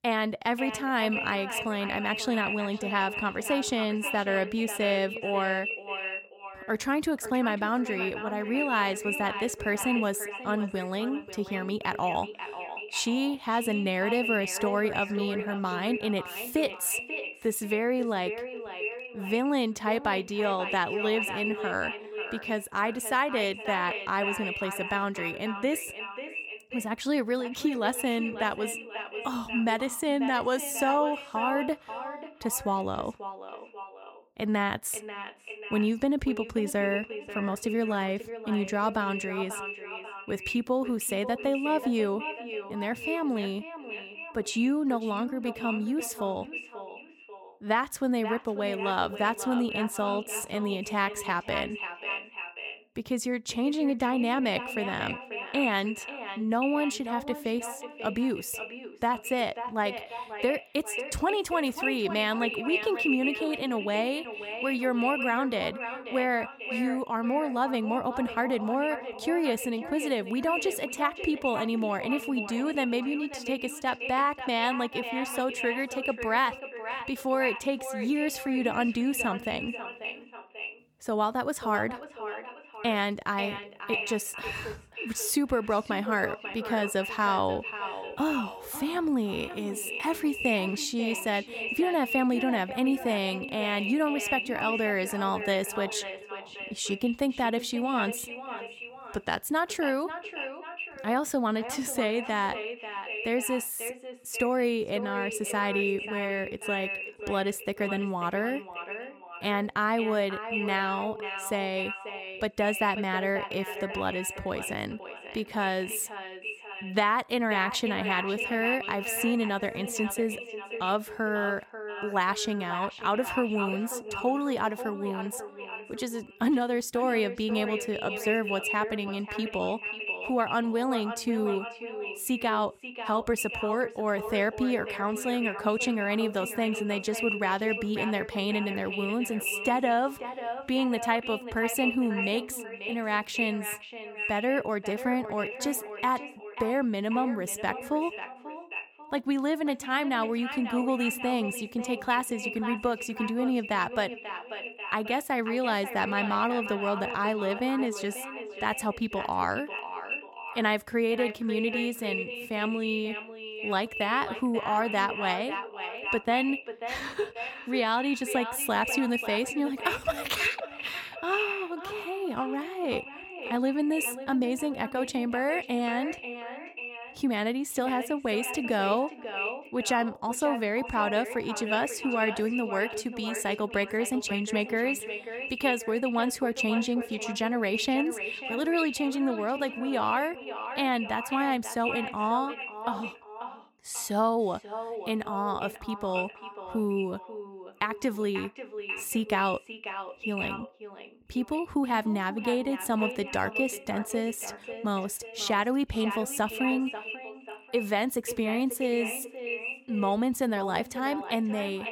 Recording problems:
echo of what is said; strong; throughout; 540 ms later, 7 dB below the speech

